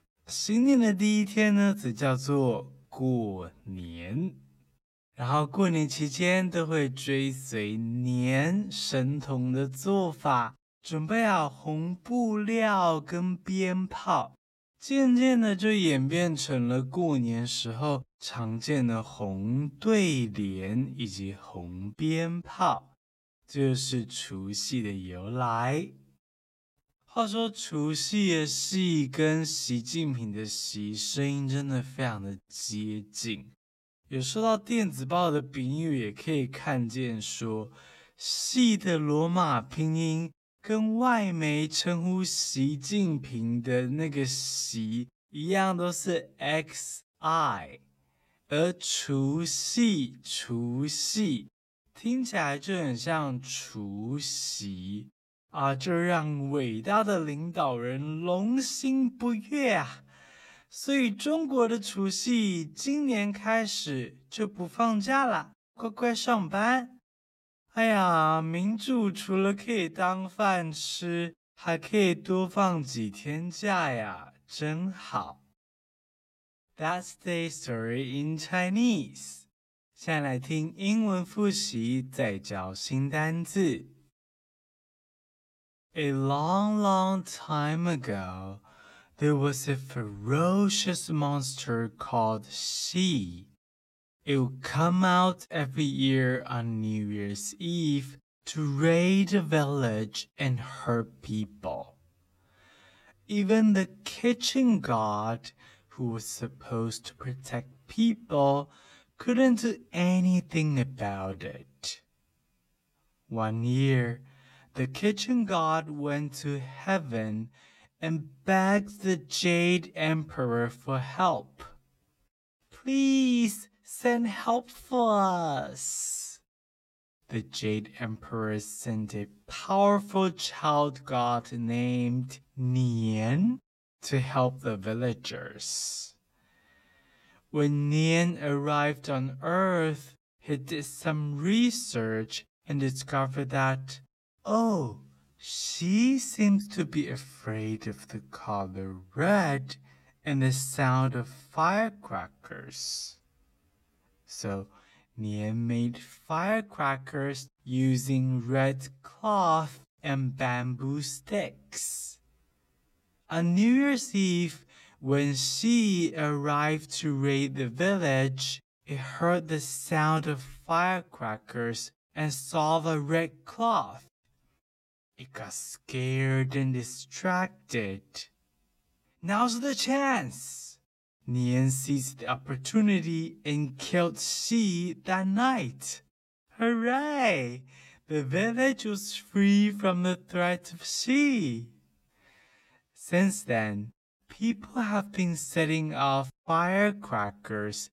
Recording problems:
wrong speed, natural pitch; too slow; 0.6 times normal speed

